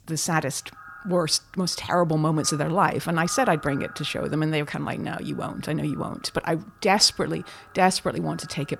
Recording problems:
echo of what is said; faint; throughout; 130 ms later, 20 dB below the speech

